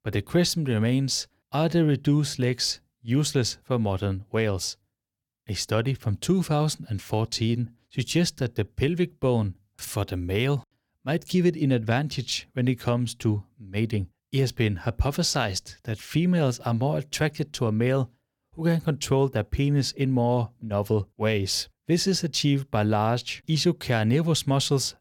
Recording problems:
none

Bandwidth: 17.5 kHz